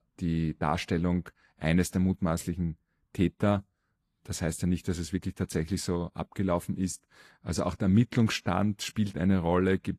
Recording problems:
garbled, watery; slightly; nothing above 14.5 kHz

